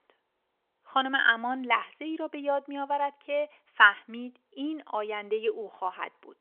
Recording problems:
phone-call audio; nothing above 3.5 kHz

